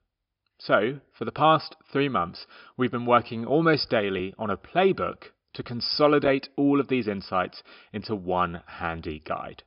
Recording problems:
high frequencies cut off; noticeable; nothing above 5.5 kHz

